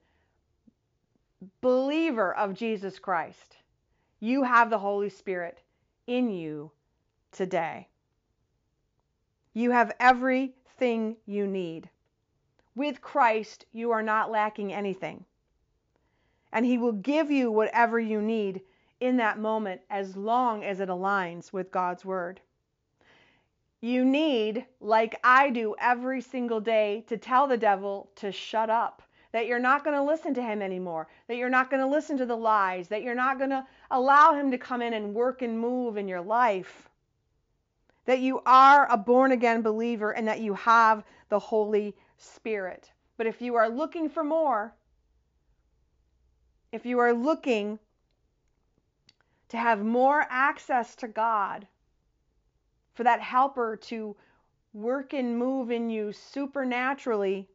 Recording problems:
high frequencies cut off; noticeable; nothing above 7.5 kHz

